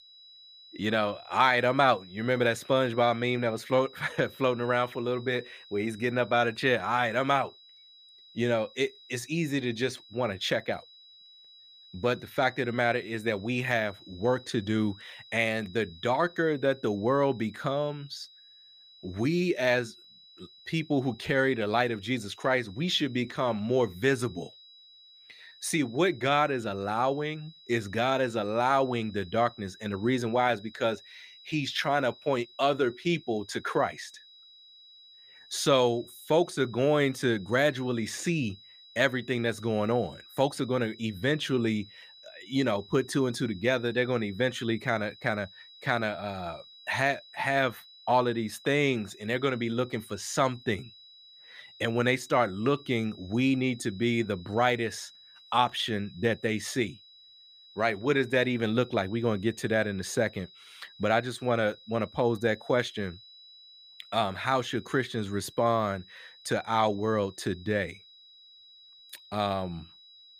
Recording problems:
high-pitched whine; faint; throughout; 4 kHz, 20 dB below the speech

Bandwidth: 15 kHz